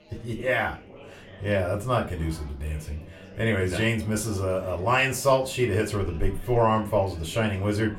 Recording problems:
off-mic speech; far
room echo; very slight; dies away in 0.3 s
chatter from many people; faint; throughout; 20 dB below the speech

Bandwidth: 16.5 kHz